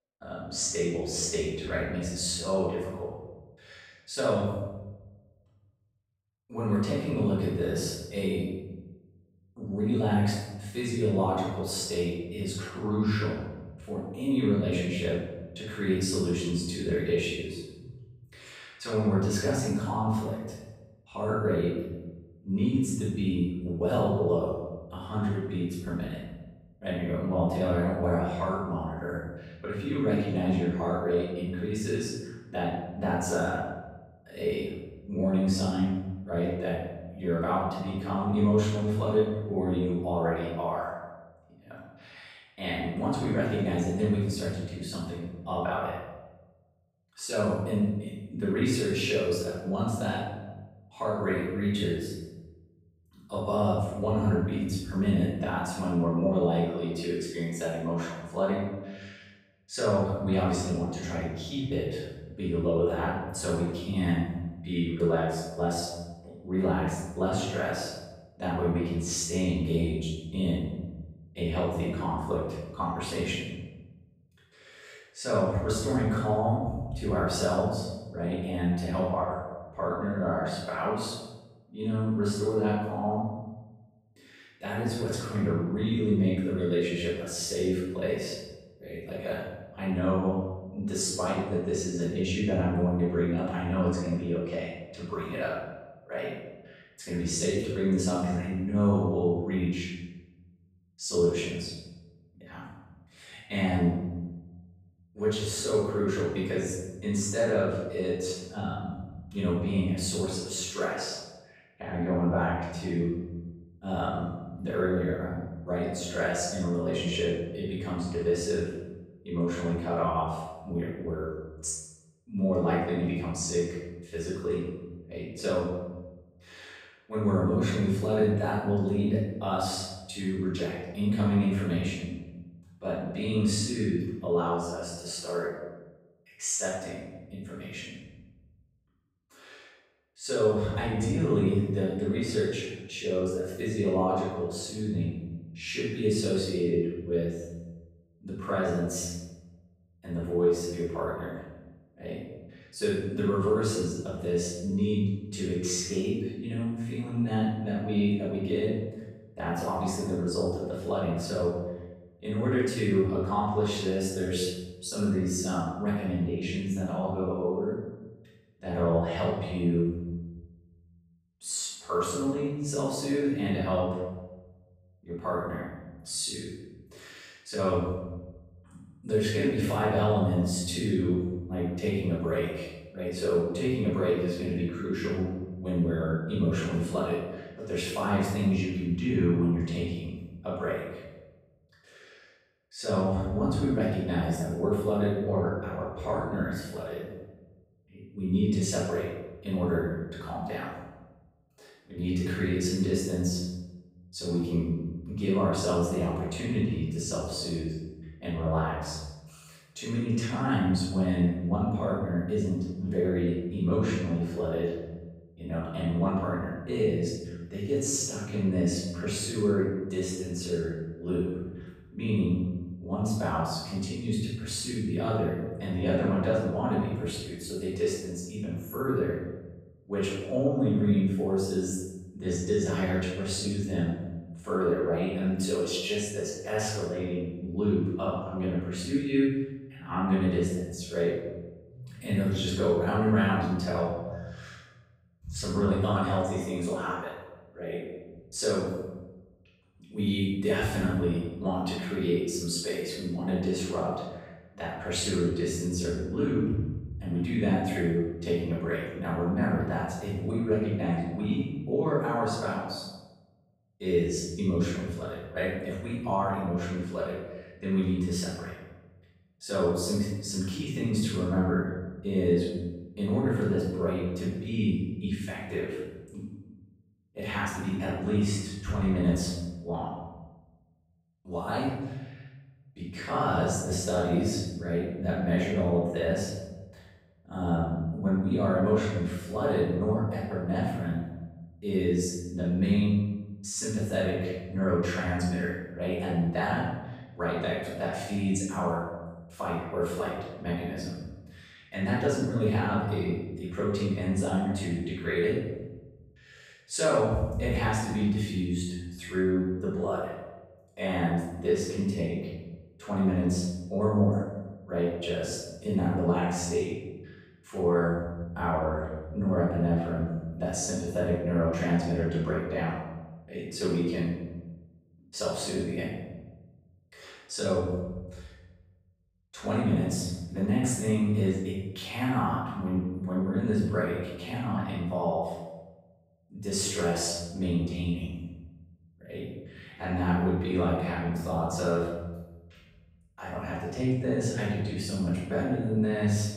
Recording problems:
room echo; strong; dies away in 1.2 s
off-mic speech; far

